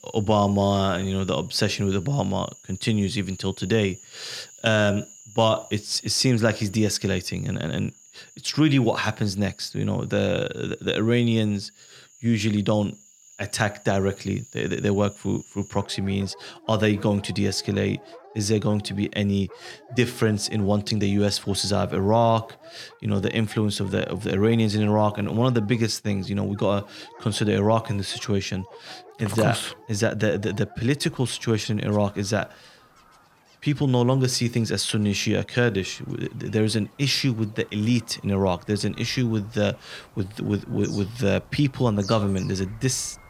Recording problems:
animal sounds; faint; throughout; 25 dB below the speech

